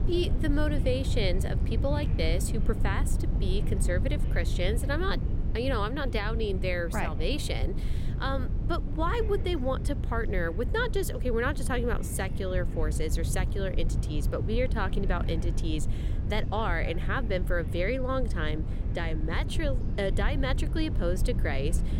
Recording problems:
low rumble; noticeable; throughout; 10 dB below the speech
voice in the background; faint; throughout; 25 dB below the speech

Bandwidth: 16 kHz